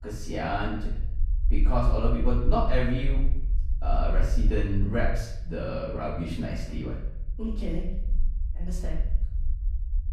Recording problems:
off-mic speech; far
room echo; noticeable; dies away in 0.8 s
low rumble; faint; throughout; 20 dB below the speech

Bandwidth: 14.5 kHz